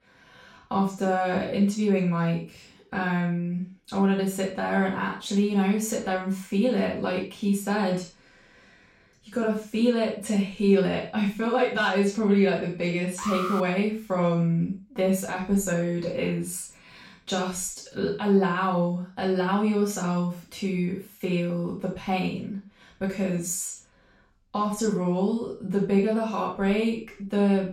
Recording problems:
off-mic speech; far
room echo; noticeable; dies away in 0.3 s
alarm; noticeable; at 13 s; peak 4 dB below the speech

